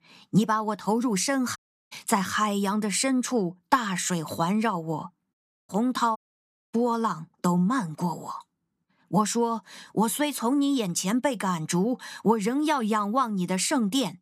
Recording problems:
audio cutting out; at 1.5 s, at 5.5 s and at 6 s for 0.5 s

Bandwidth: 14.5 kHz